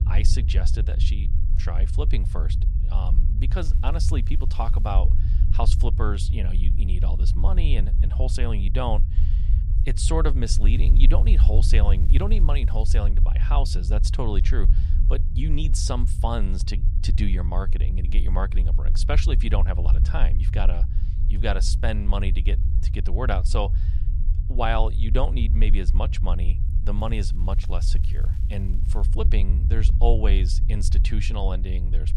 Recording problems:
low rumble; loud; throughout; 10 dB below the speech
crackling; faint; from 3.5 to 5 s, from 10 to 13 s and from 27 to 29 s; 30 dB below the speech

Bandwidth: 15 kHz